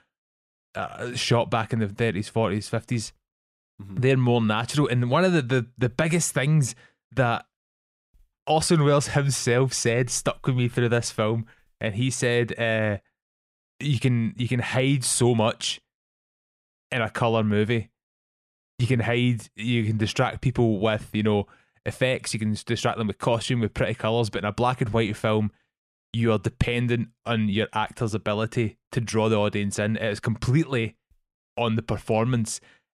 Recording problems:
none

